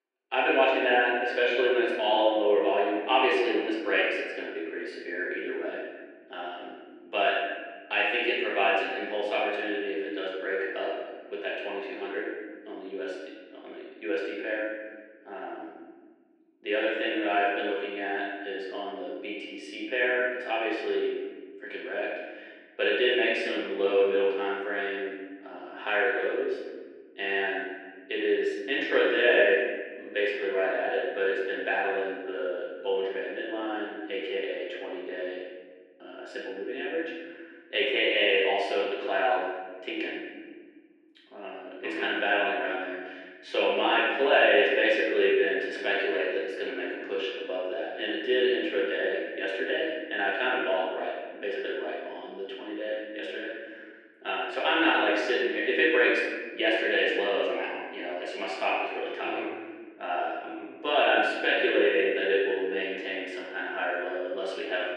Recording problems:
off-mic speech; far
muffled; very; fading above 2 kHz
room echo; noticeable; dies away in 1.4 s
thin; somewhat; fading below 300 Hz

